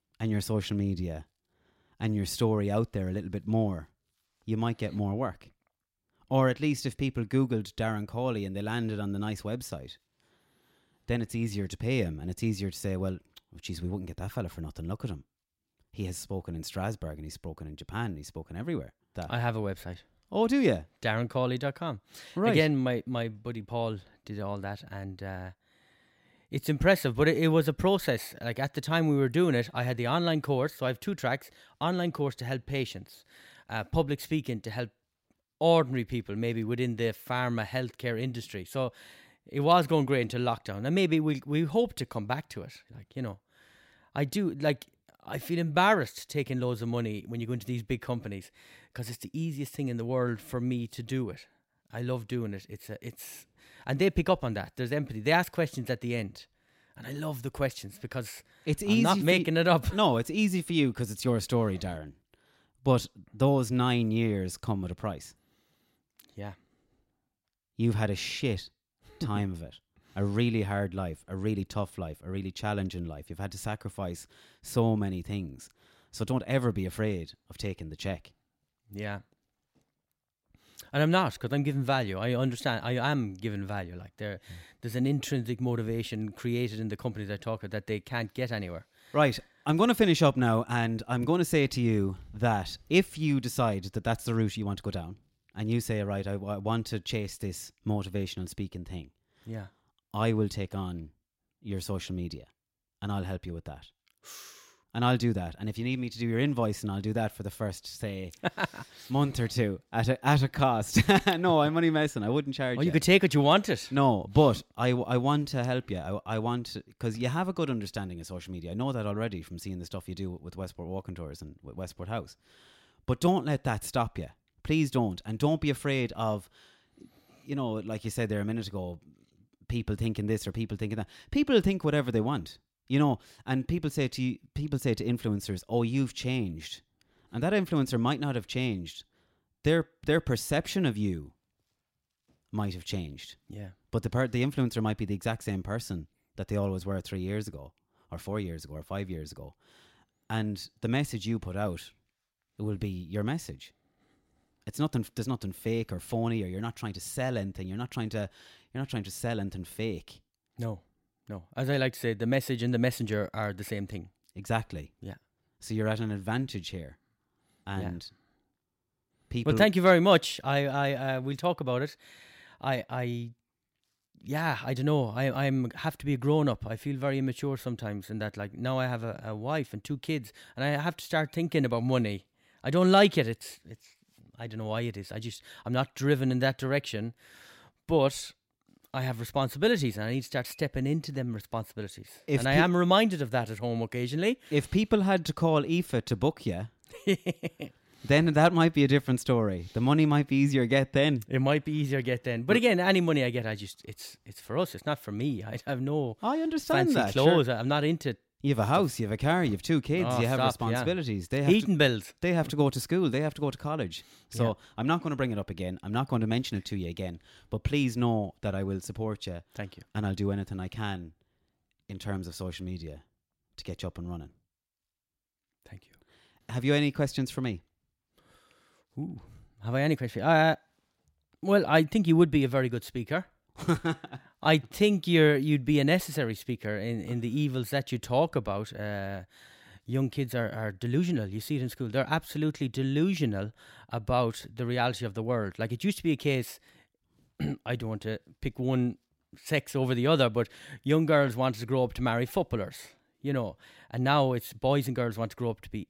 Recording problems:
none

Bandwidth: 16 kHz